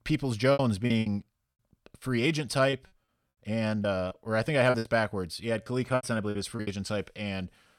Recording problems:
choppy; very; 11% of the speech affected

